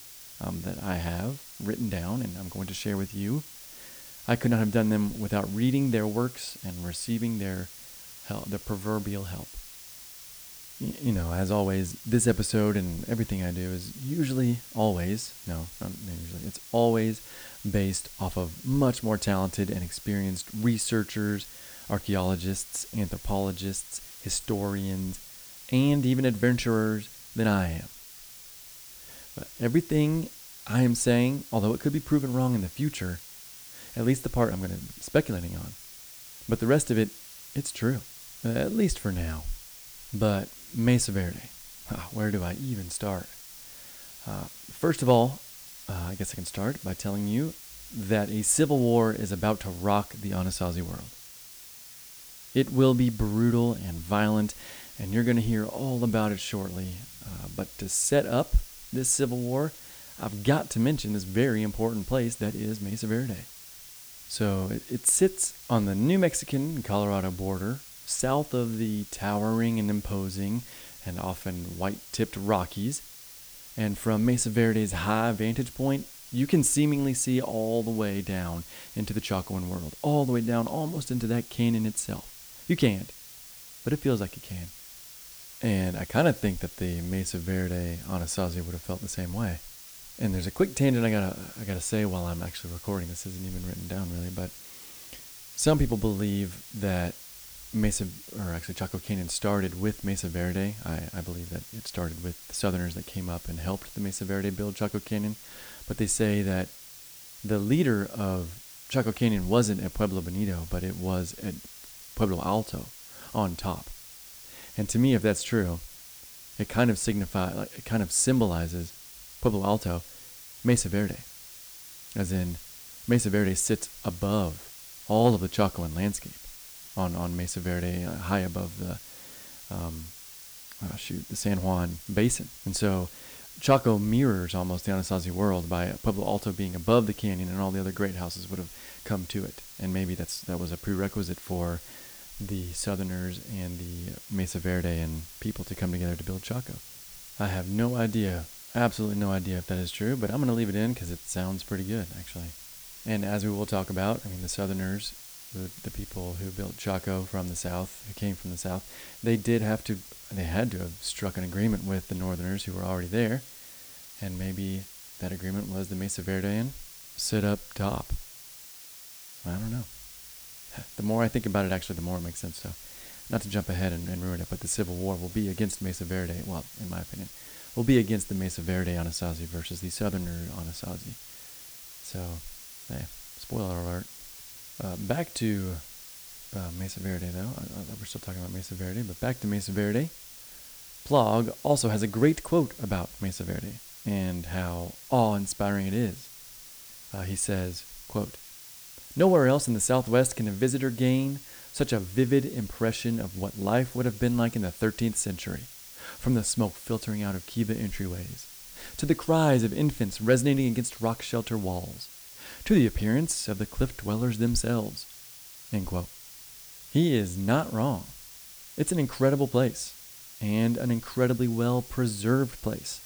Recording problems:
hiss; noticeable; throughout; 15 dB below the speech

